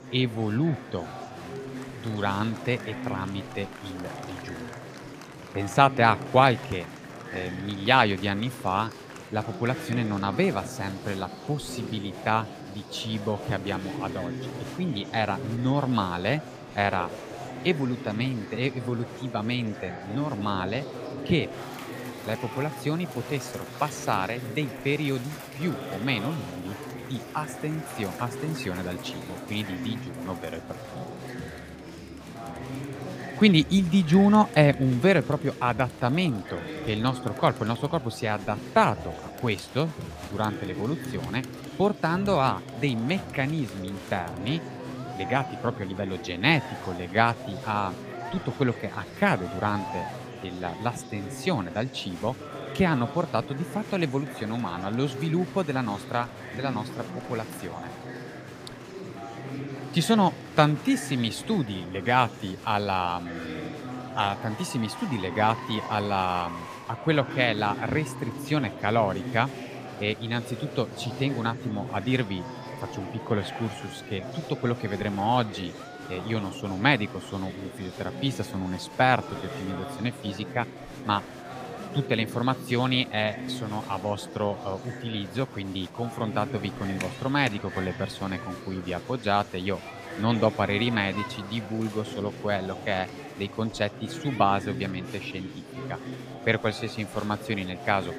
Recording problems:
murmuring crowd; noticeable; throughout; 10 dB below the speech

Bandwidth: 15 kHz